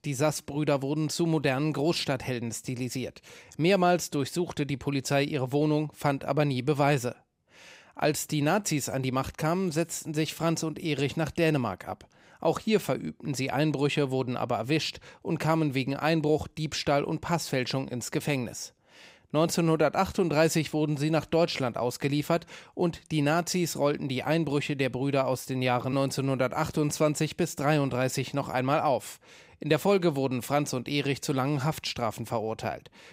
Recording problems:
none

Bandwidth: 15.5 kHz